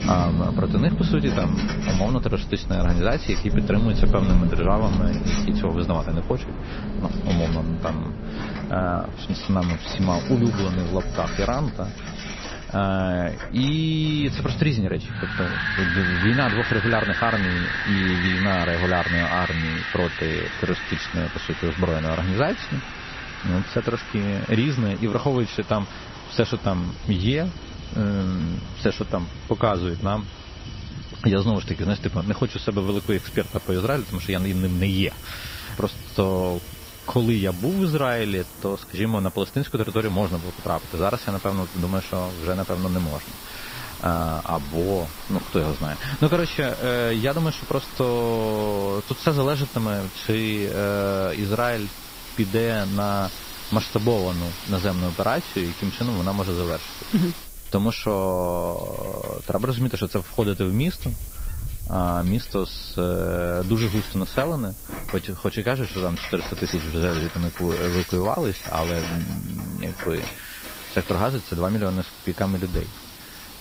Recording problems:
garbled, watery; slightly; nothing above 6 kHz
animal sounds; loud; throughout; 5 dB below the speech
wind in the background; loud; throughout; 8 dB below the speech
household noises; noticeable; throughout; 15 dB below the speech
hiss; noticeable; from 33 s on; 15 dB below the speech

